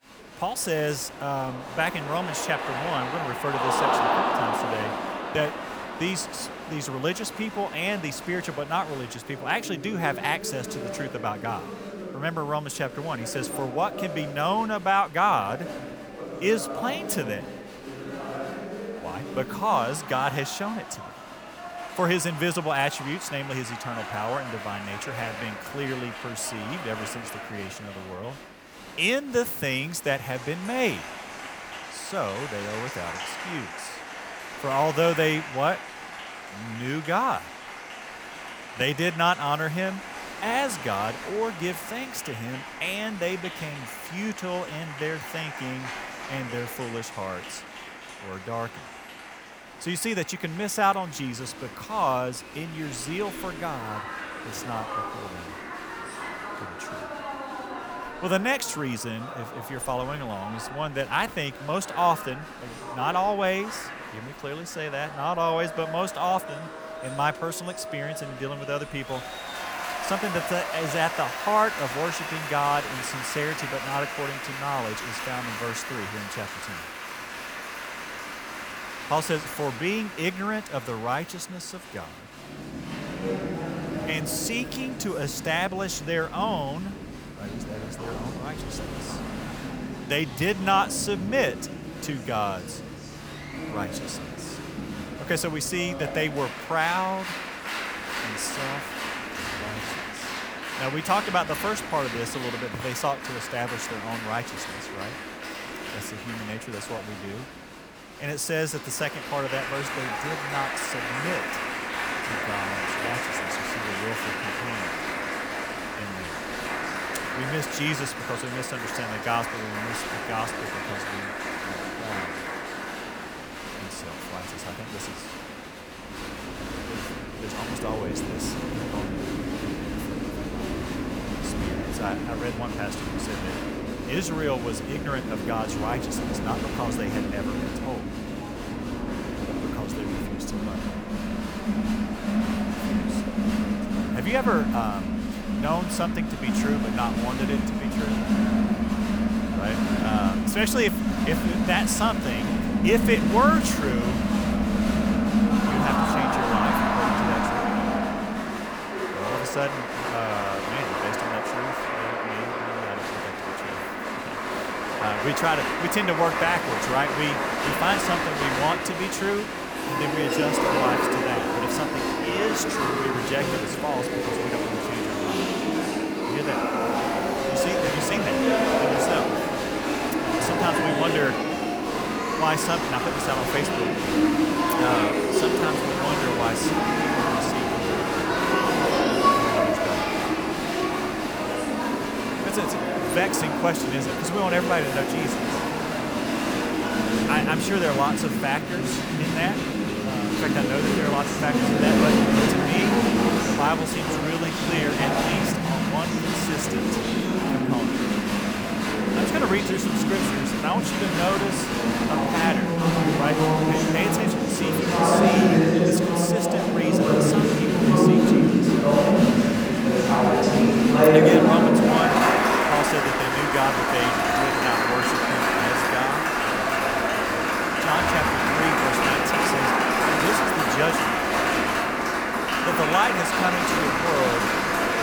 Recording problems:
crowd noise; very loud; throughout; 4 dB above the speech

